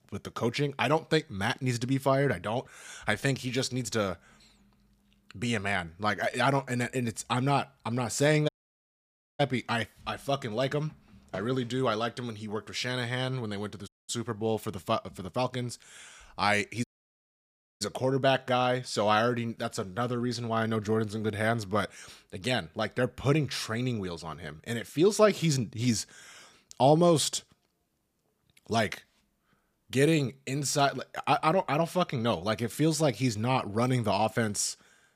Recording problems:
audio cutting out; at 8.5 s for 1 s, at 14 s and at 17 s for 1 s

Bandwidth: 15 kHz